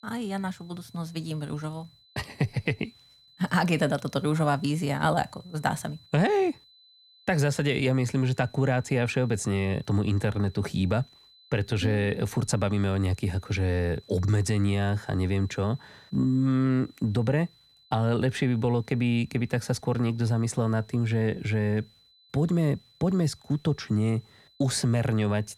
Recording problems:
high-pitched whine; faint; throughout; 4 kHz, 30 dB below the speech

